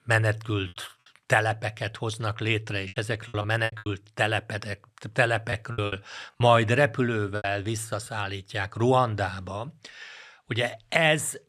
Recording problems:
choppy; very; at 3 s, at 5.5 s and at 7.5 s; 11% of the speech affected

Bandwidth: 14.5 kHz